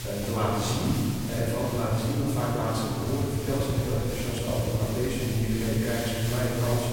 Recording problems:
room echo; strong; dies away in 2.5 s
off-mic speech; far
electrical hum; faint; throughout; 60 Hz, 20 dB below the speech
traffic noise; very faint; throughout; 10 dB below the speech
hiss; very faint; throughout; 10 dB below the speech

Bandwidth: 16.5 kHz